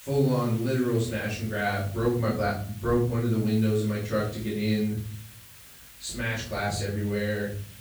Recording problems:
off-mic speech; far
room echo; noticeable; dies away in 0.6 s
hiss; noticeable; throughout; 20 dB below the speech

